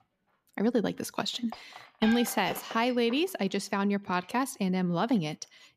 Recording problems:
household noises; noticeable; throughout; 15 dB below the speech

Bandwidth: 14.5 kHz